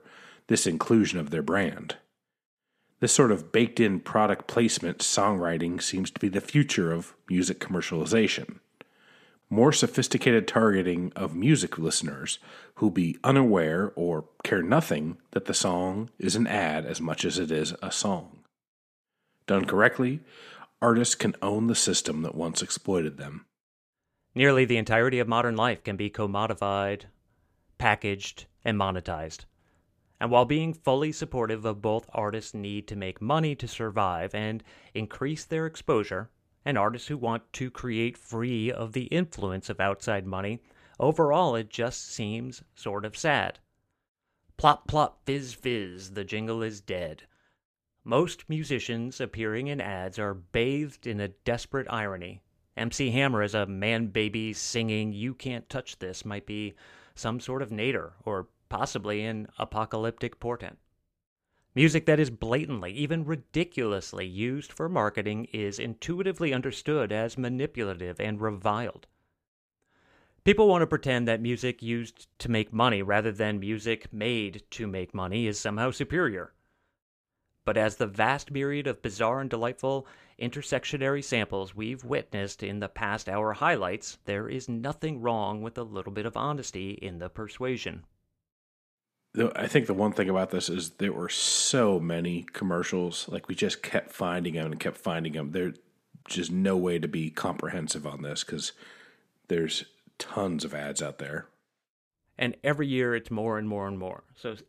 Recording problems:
none

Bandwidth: 14.5 kHz